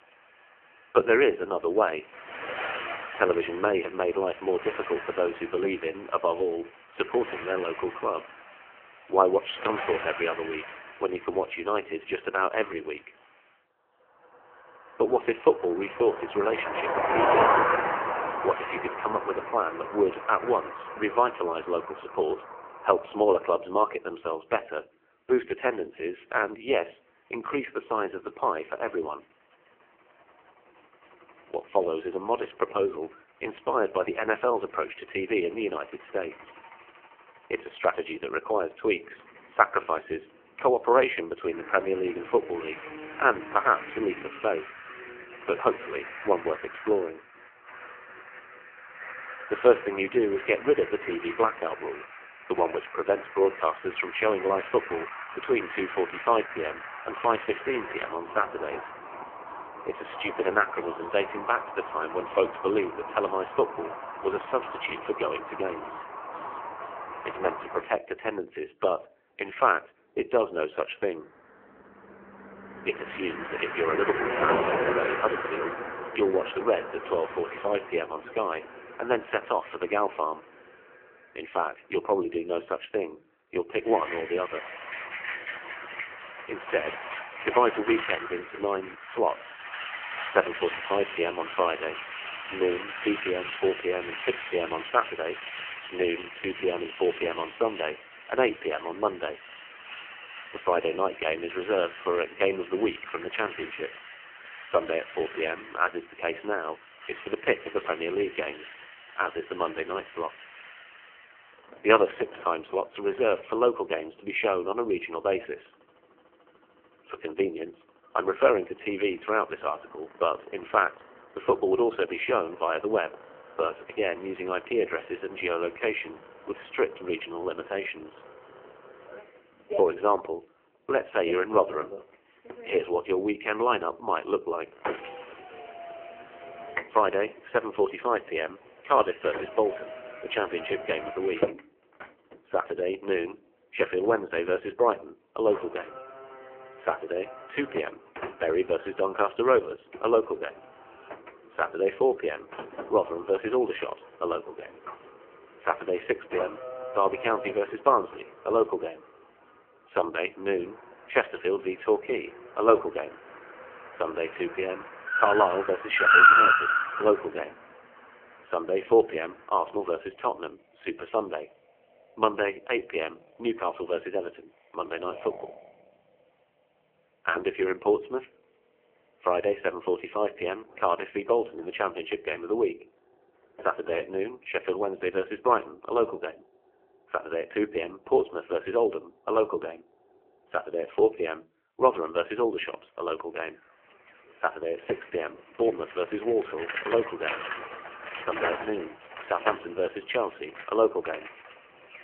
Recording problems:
phone-call audio; poor line; nothing above 3 kHz
traffic noise; loud; throughout; 5 dB below the speech

